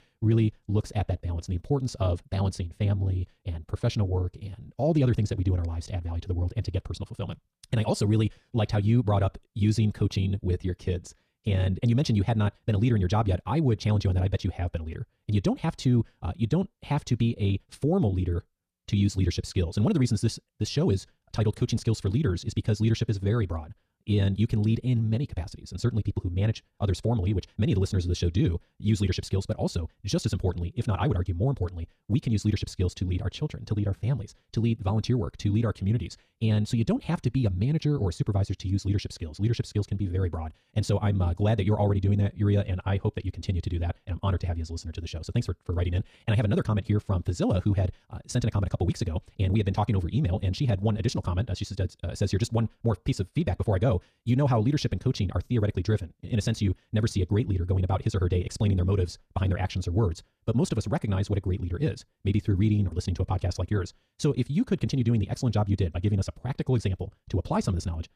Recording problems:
wrong speed, natural pitch; too fast; 1.8 times normal speed

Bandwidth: 14 kHz